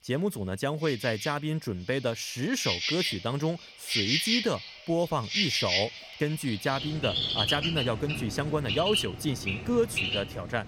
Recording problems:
animal sounds; very loud; throughout; 1 dB above the speech

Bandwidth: 17 kHz